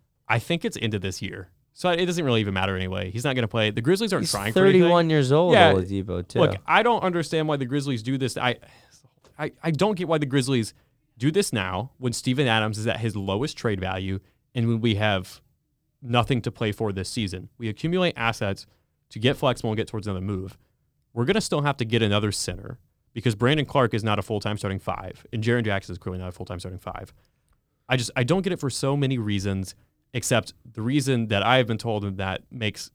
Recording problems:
none

